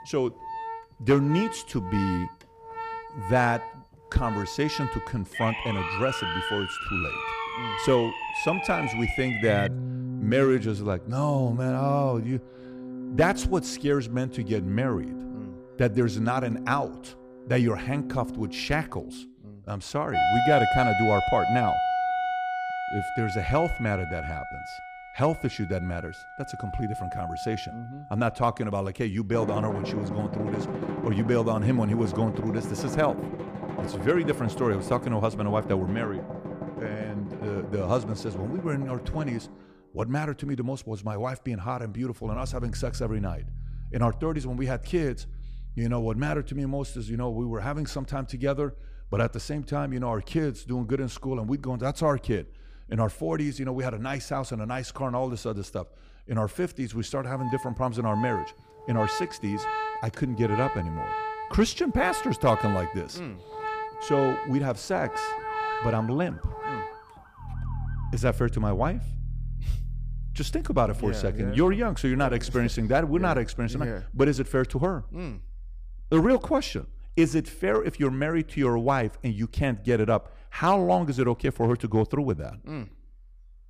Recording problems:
background music; loud; throughout; 6 dB below the speech
siren; noticeable; from 5.5 to 9.5 s; peak 1 dB below the speech
siren; faint; from 1:05 to 1:08; peak 15 dB below the speech

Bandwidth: 15 kHz